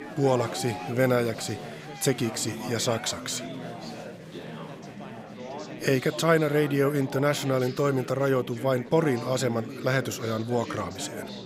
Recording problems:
chatter from many people; noticeable; throughout; 10 dB below the speech

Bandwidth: 15.5 kHz